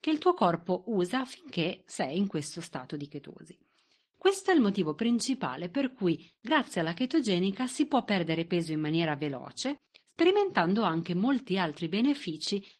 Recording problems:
garbled, watery; slightly

